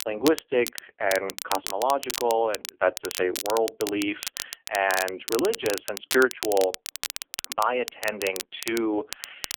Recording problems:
phone-call audio; poor line; nothing above 3.5 kHz
crackle, like an old record; loud; 7 dB below the speech

